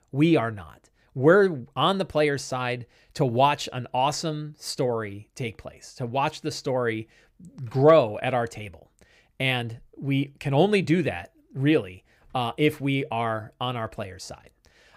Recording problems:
none

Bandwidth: 15.5 kHz